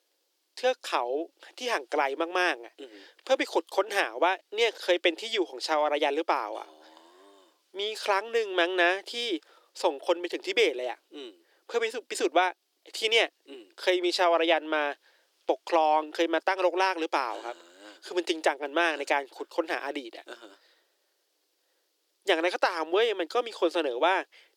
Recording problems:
thin; very; fading below 300 Hz

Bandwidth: 18.5 kHz